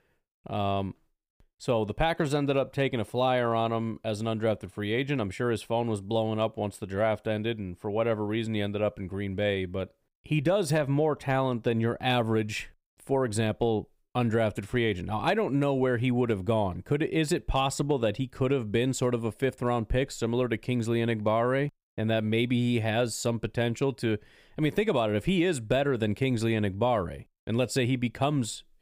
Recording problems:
none

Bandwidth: 15.5 kHz